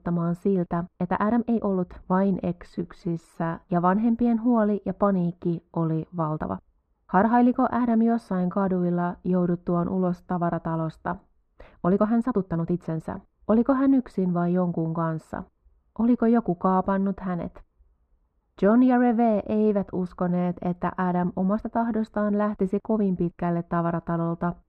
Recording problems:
muffled; very; fading above 3.5 kHz
uneven, jittery; strongly; from 1 to 22 s

